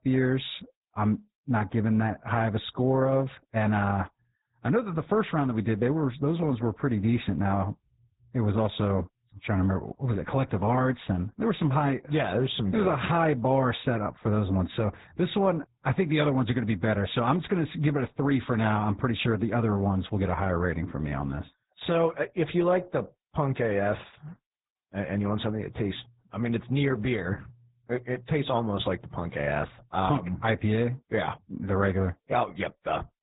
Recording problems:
garbled, watery; badly
high frequencies cut off; severe; nothing above 4 kHz

